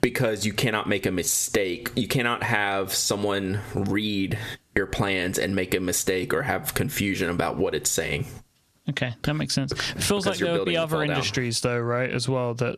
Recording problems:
squashed, flat; heavily

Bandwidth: 14 kHz